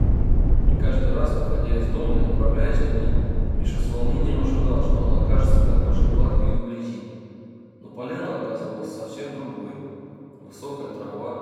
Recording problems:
room echo; strong; dies away in 2.7 s
off-mic speech; far
low rumble; loud; until 6.5 s; 4 dB below the speech

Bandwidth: 16 kHz